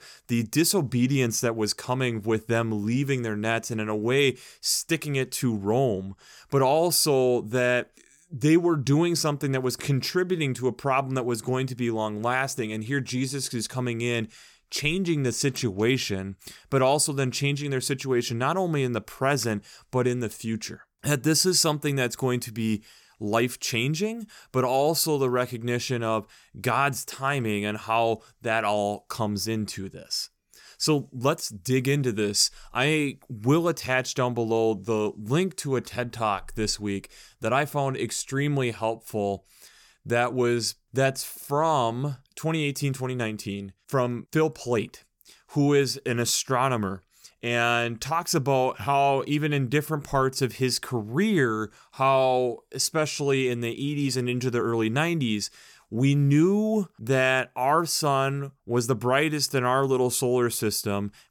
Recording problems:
none

